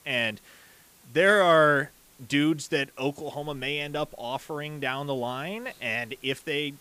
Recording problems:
hiss; faint; throughout; 30 dB below the speech

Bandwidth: 15 kHz